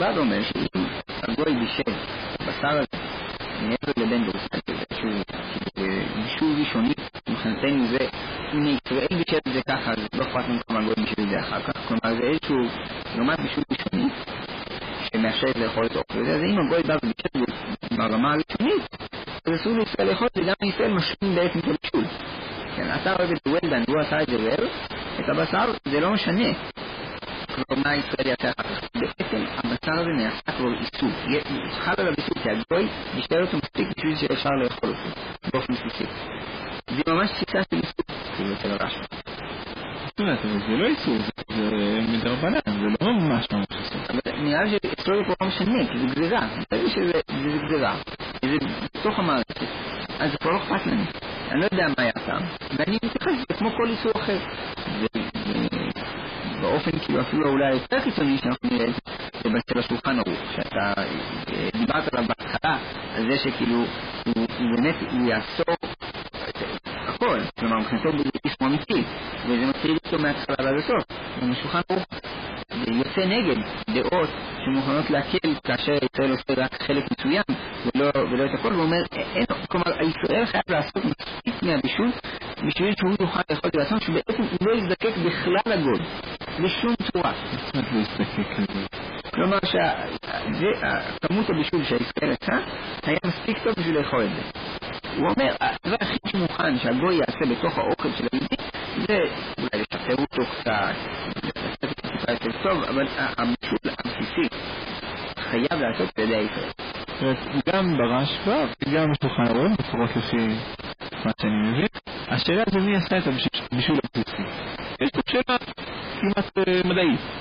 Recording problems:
distortion; heavy; 5 dB below the speech
garbled, watery; badly; nothing above 4 kHz
hiss; loud; throughout; 8 dB below the speech
choppy; very; 16% of the speech affected
abrupt cut into speech; at the start

